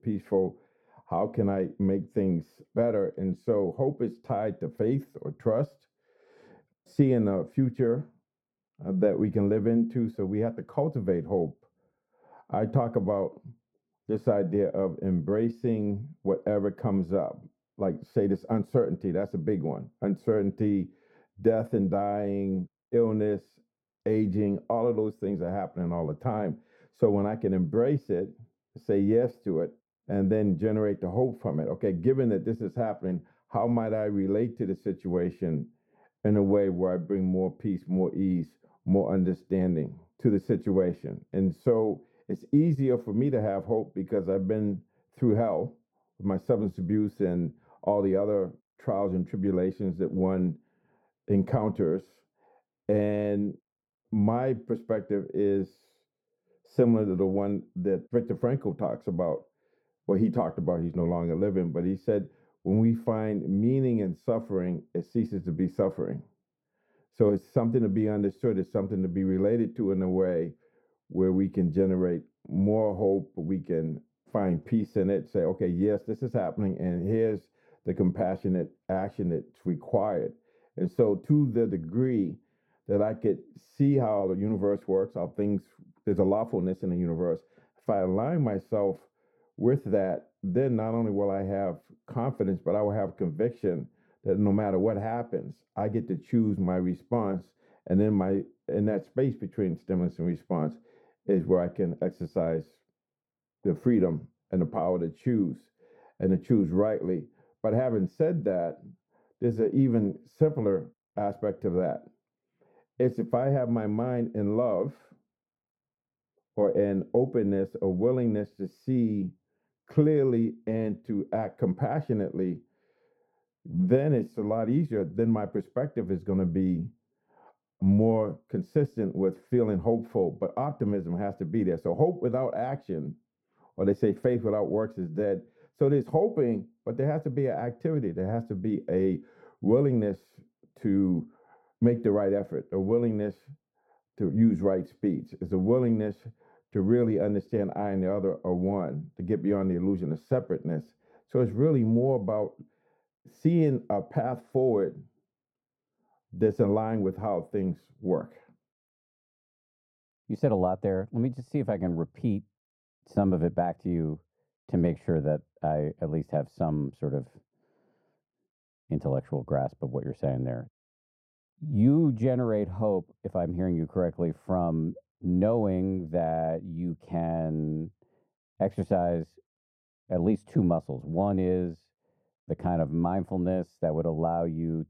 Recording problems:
muffled; very; fading above 1 kHz

